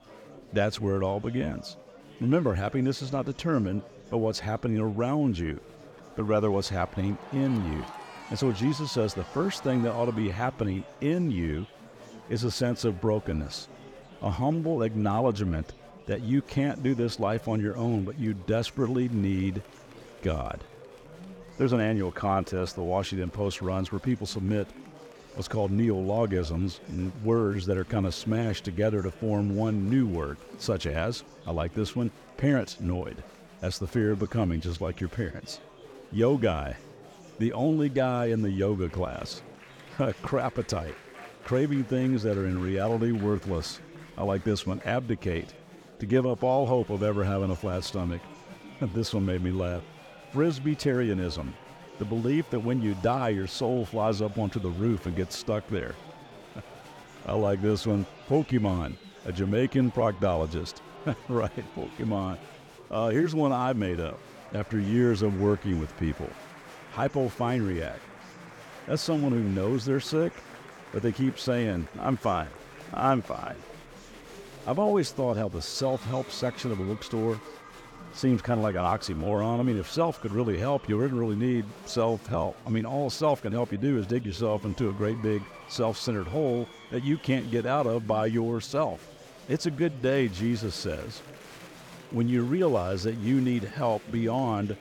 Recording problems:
murmuring crowd; noticeable; throughout; 20 dB below the speech

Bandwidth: 17.5 kHz